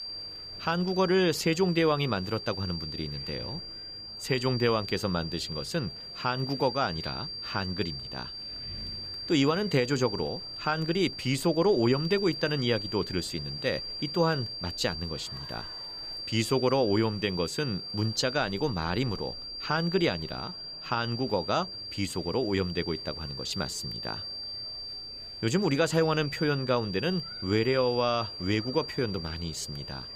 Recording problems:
high-pitched whine; loud; throughout; 4.5 kHz, 7 dB below the speech
wind in the background; faint; throughout; 30 dB below the speech
murmuring crowd; faint; throughout; 25 dB below the speech

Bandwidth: 15 kHz